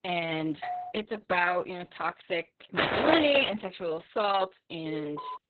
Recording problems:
garbled, watery; badly; nothing above 4 kHz
doorbell; noticeable; at 0.5 s; peak 8 dB below the speech
footsteps; loud; at 3 s; peak 3 dB above the speech
alarm; noticeable; at 5 s; peak 6 dB below the speech

